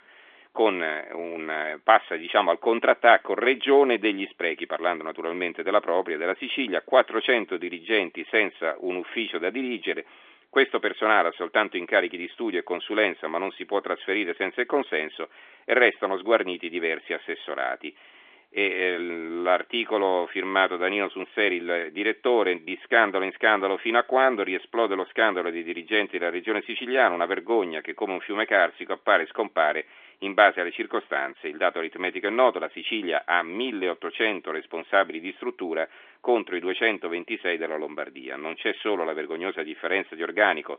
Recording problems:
phone-call audio; nothing above 3.5 kHz

